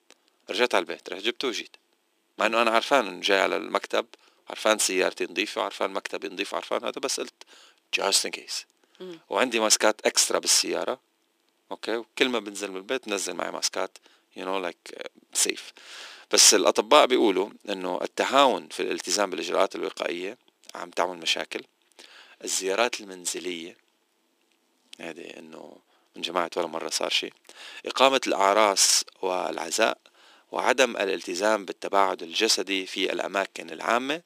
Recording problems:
thin; very; fading below 300 Hz

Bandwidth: 15 kHz